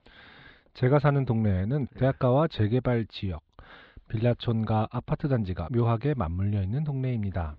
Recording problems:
muffled; slightly; fading above 4 kHz

